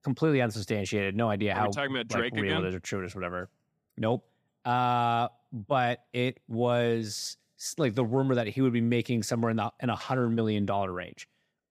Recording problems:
none

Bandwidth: 15 kHz